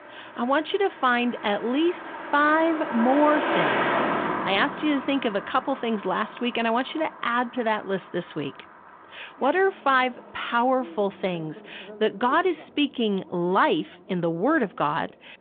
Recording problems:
phone-call audio
traffic noise; loud; throughout; 6 dB below the speech

